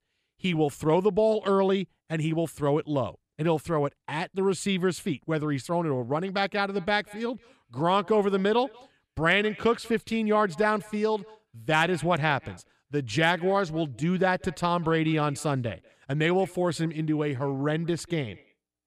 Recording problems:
echo of what is said; faint; from 6.5 s on; 190 ms later, 25 dB below the speech

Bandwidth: 15 kHz